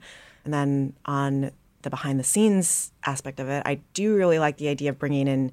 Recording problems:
none

